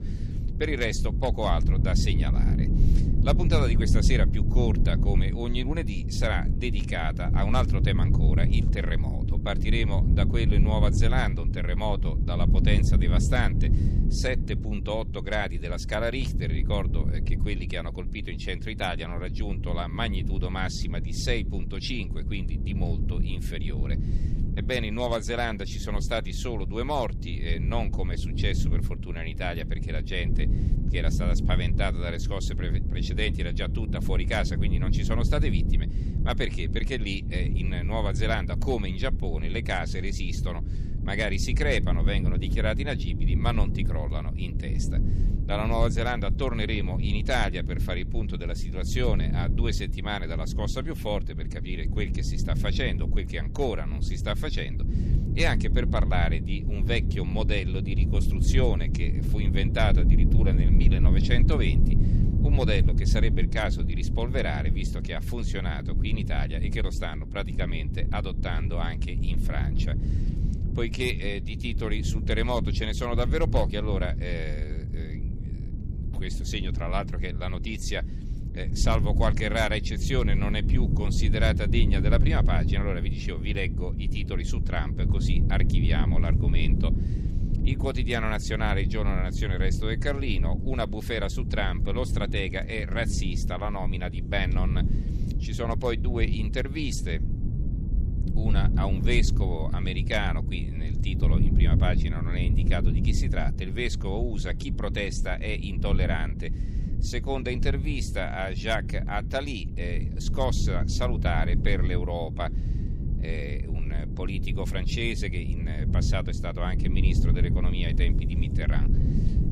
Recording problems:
low rumble; loud; throughout; 8 dB below the speech

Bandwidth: 13.5 kHz